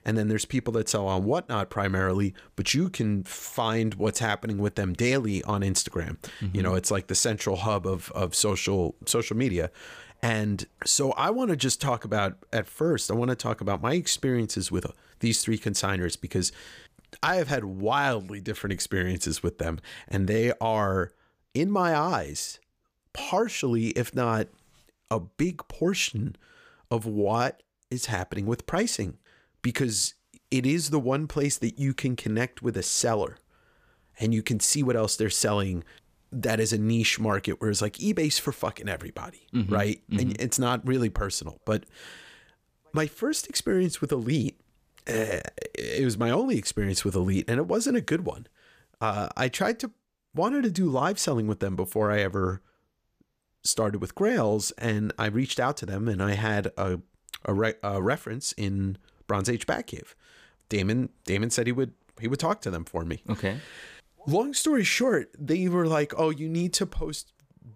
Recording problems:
none

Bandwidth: 15 kHz